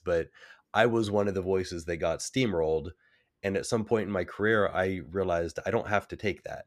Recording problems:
none

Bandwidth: 15 kHz